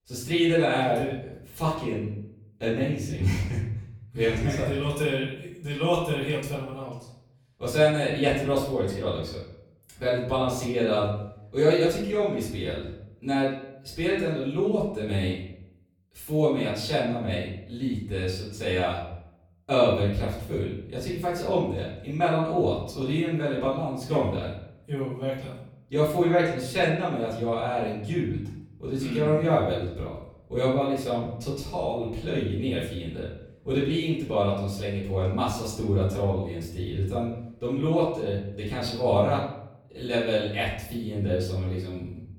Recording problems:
off-mic speech; far
room echo; noticeable; dies away in 0.7 s

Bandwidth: 17.5 kHz